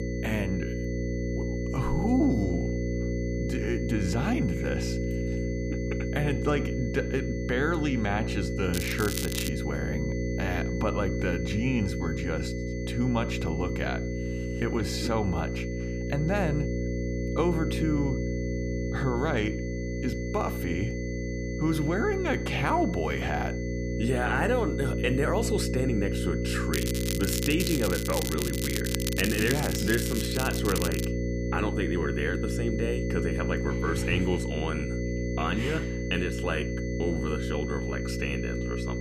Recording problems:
electrical hum; loud; throughout; 60 Hz, 5 dB below the speech
crackling; loud; at 8.5 s and from 27 to 31 s; 4 dB below the speech
high-pitched whine; noticeable; throughout; 2 kHz, 15 dB below the speech

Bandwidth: 15 kHz